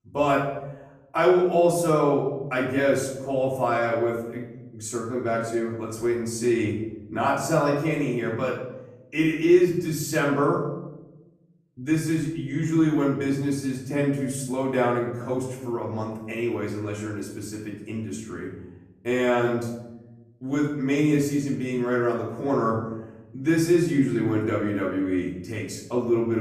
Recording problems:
off-mic speech; far
room echo; noticeable; dies away in 1 s
abrupt cut into speech; at the end

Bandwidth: 14 kHz